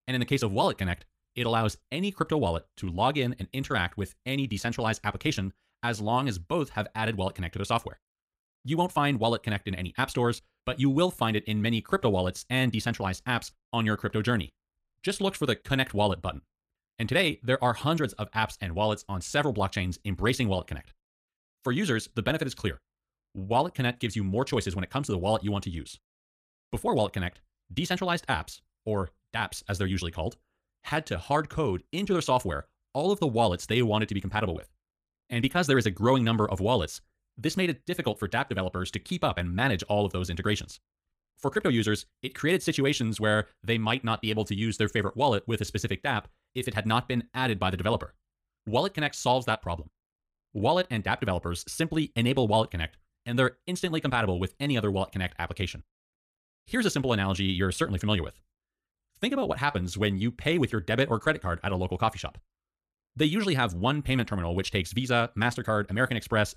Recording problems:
wrong speed, natural pitch; too fast; 1.7 times normal speed

